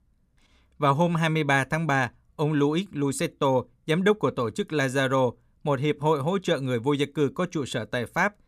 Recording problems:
none

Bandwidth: 15 kHz